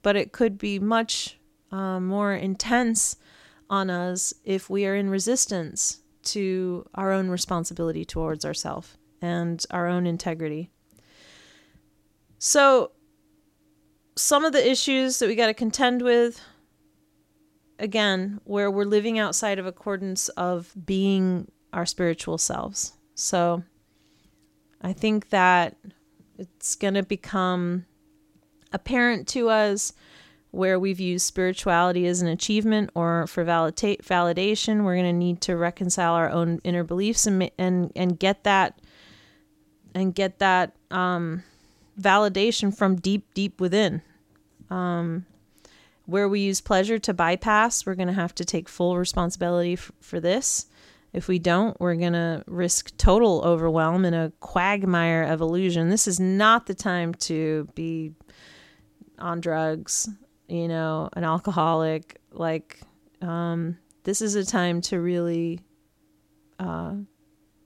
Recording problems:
none

